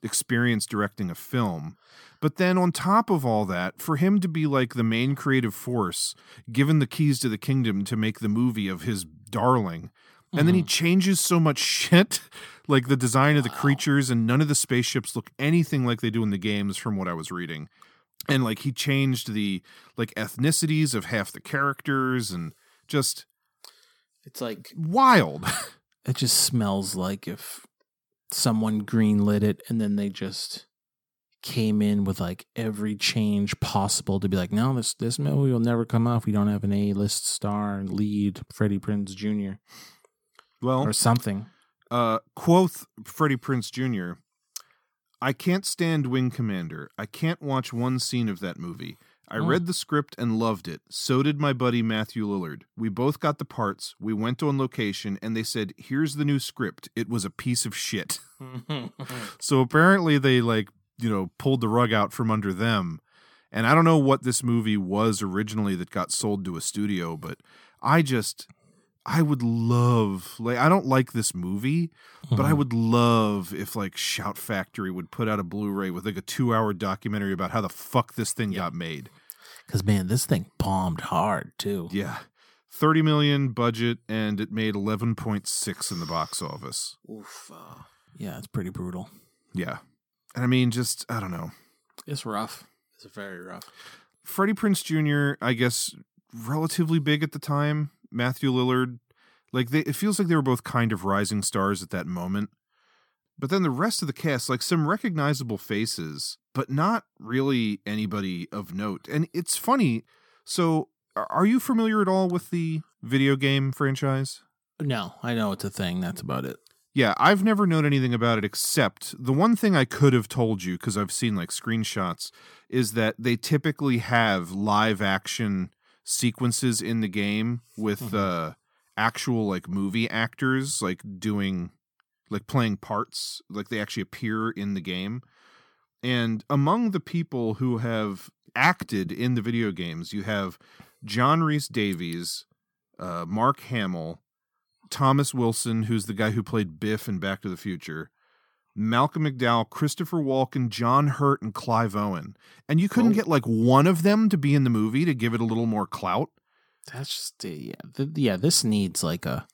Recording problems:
none

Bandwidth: 18 kHz